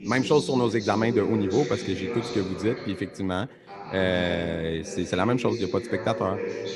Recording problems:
voice in the background; loud; throughout; 7 dB below the speech

